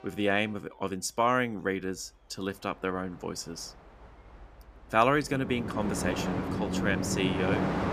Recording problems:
train or aircraft noise; loud; throughout; 2 dB below the speech

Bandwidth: 14.5 kHz